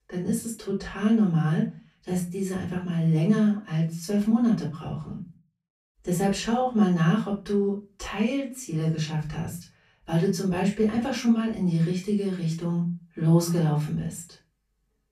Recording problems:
off-mic speech; far
room echo; slight; dies away in 0.3 s

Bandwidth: 14.5 kHz